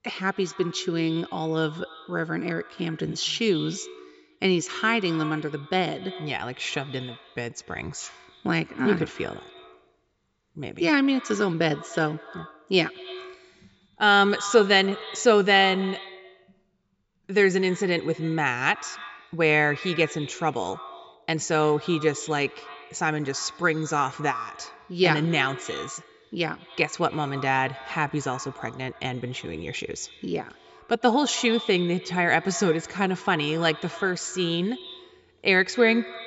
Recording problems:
echo of what is said; noticeable; throughout; 90 ms later, 15 dB below the speech
high frequencies cut off; noticeable; nothing above 8 kHz

